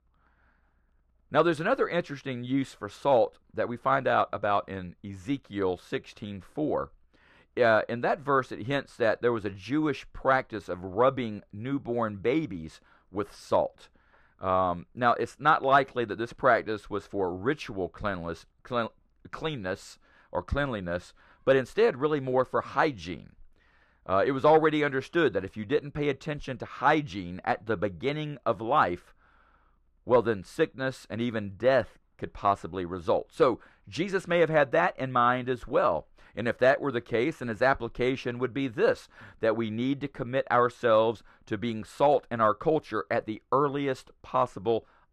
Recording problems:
muffled; slightly; fading above 3.5 kHz

